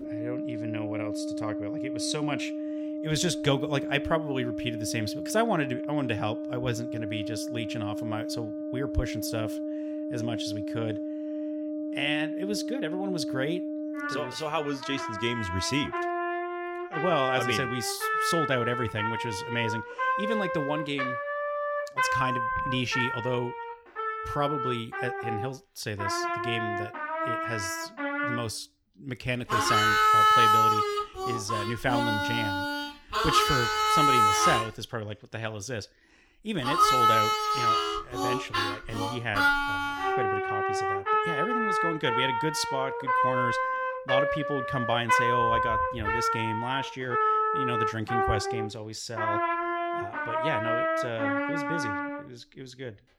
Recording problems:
background music; very loud; throughout; 4 dB above the speech

